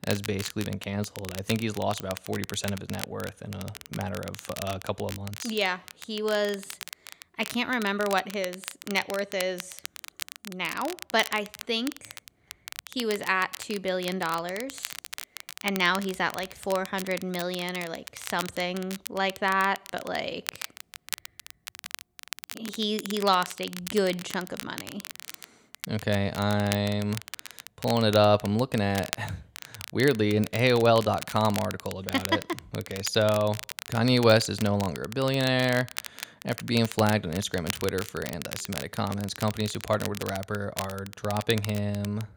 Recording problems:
crackle, like an old record; noticeable; 10 dB below the speech

